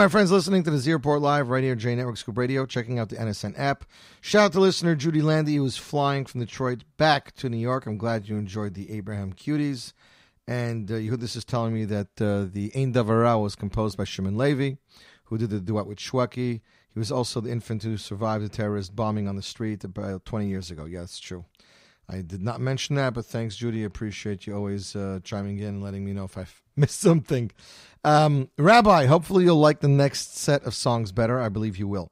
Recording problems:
abrupt cut into speech; at the start

